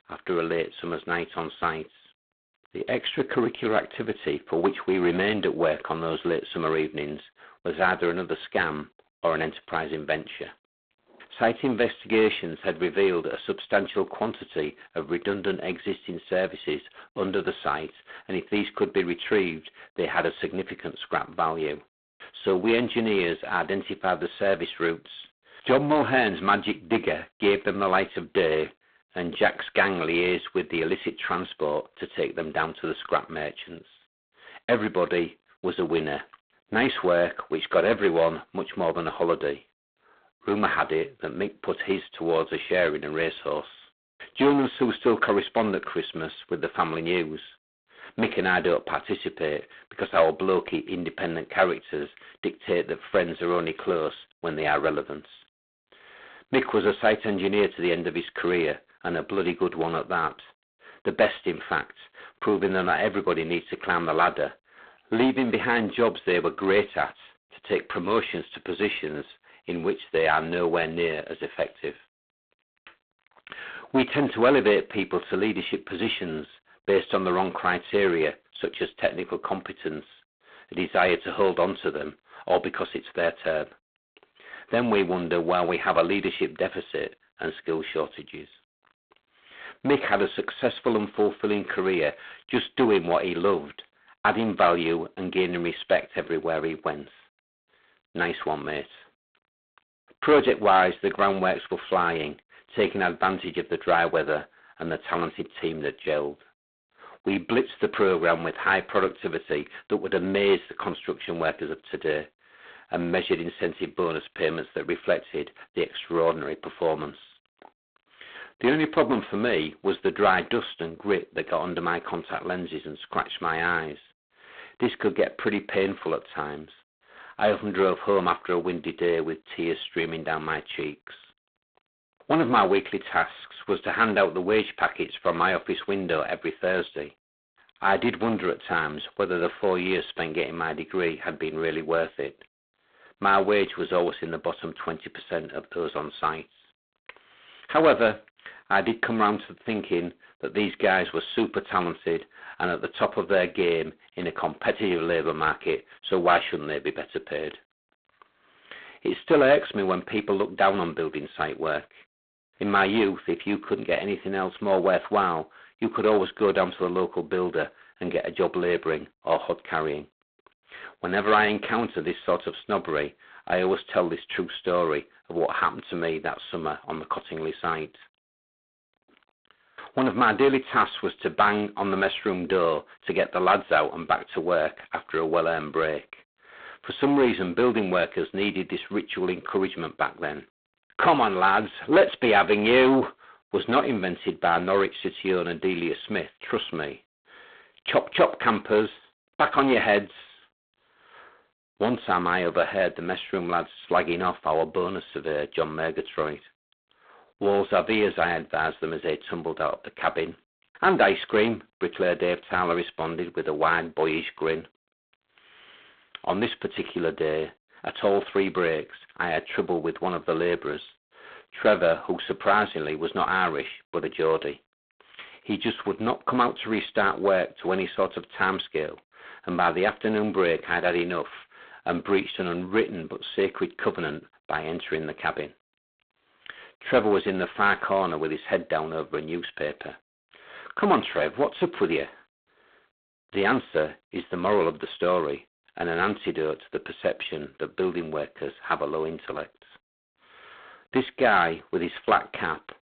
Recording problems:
phone-call audio; poor line; nothing above 4 kHz
distortion; slight; 15 dB below the speech

